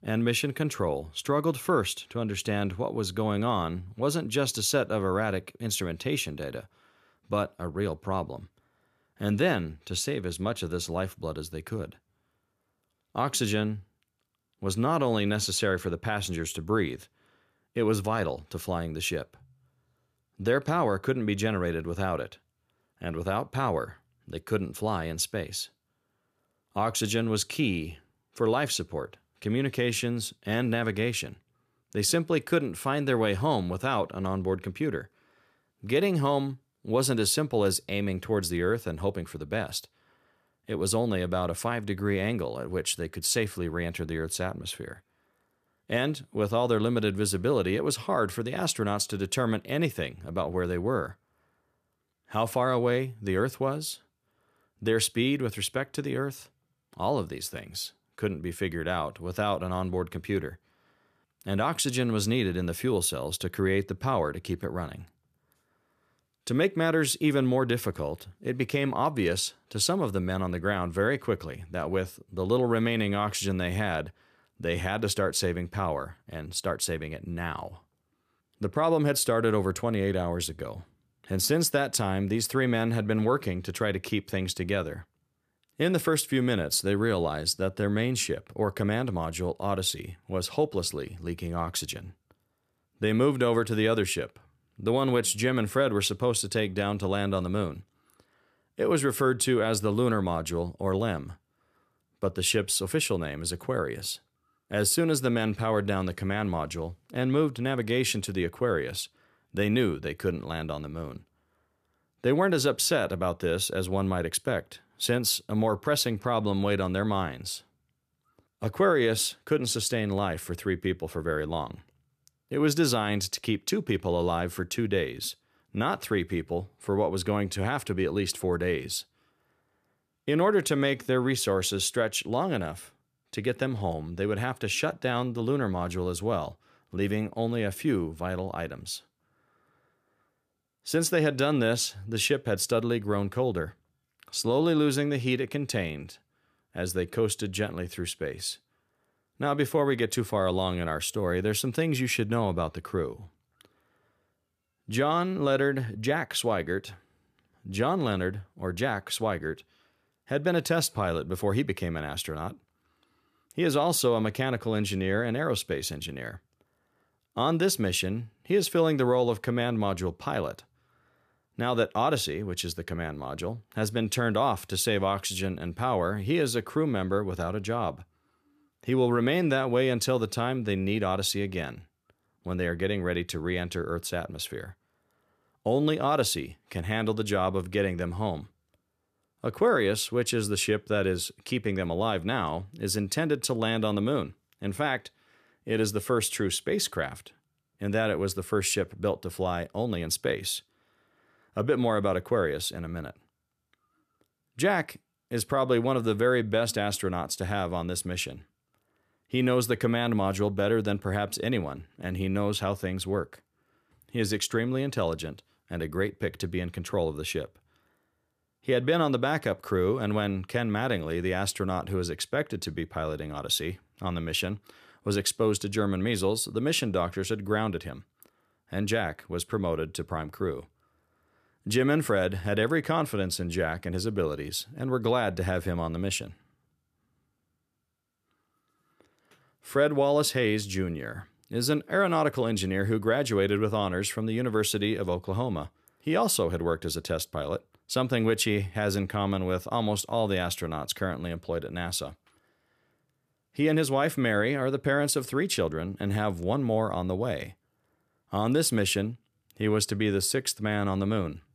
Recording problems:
none

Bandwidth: 14.5 kHz